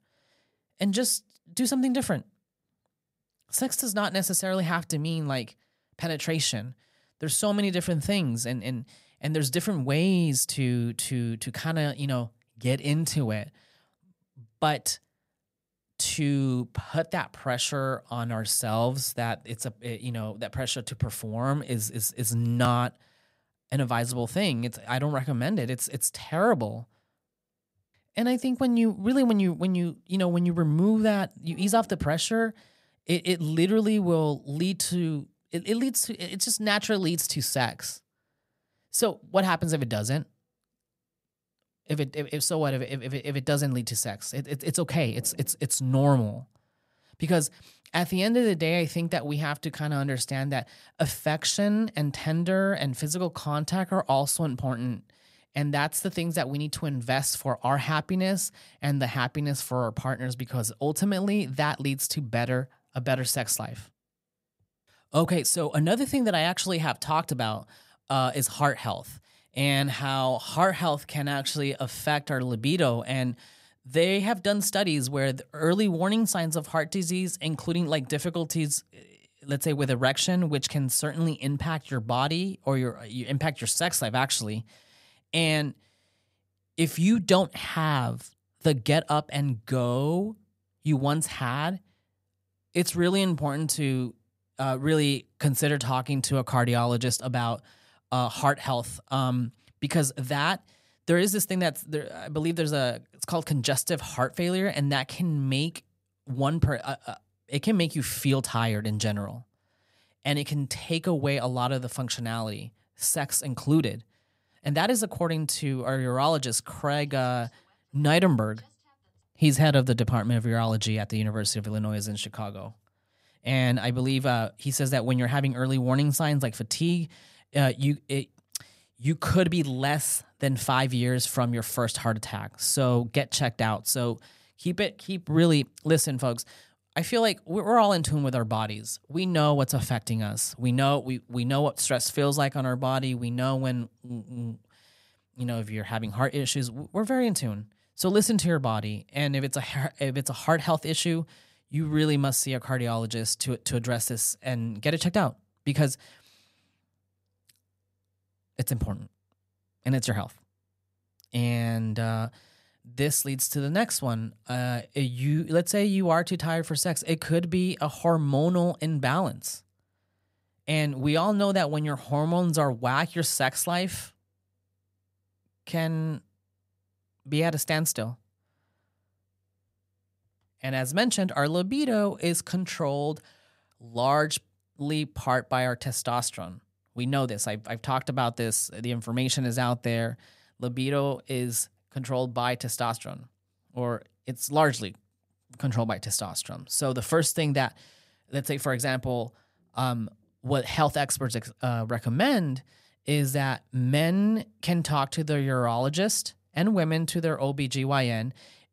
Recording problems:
none

